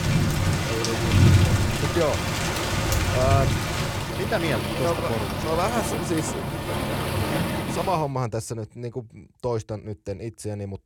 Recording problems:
rain or running water; very loud; until 8 s; 4 dB above the speech

